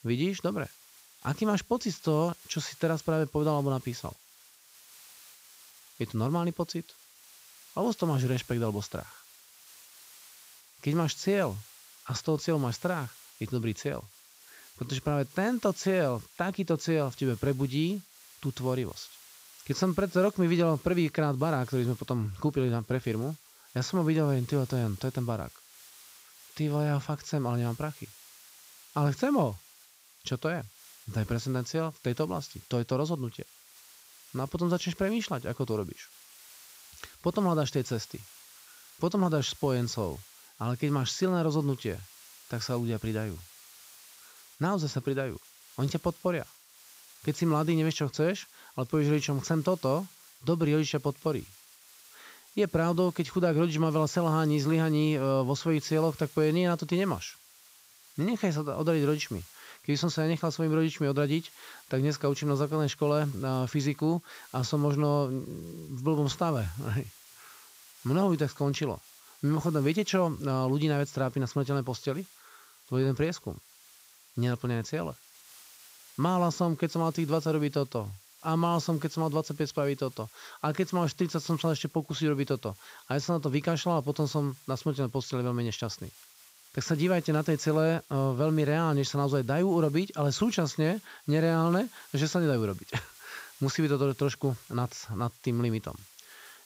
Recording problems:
high frequencies cut off; noticeable; nothing above 8 kHz
hiss; faint; throughout; 20 dB below the speech

